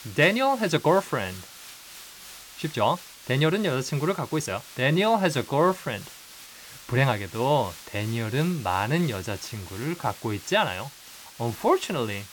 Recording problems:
hiss; noticeable; throughout; 15 dB below the speech
uneven, jittery; strongly; from 0.5 to 12 s

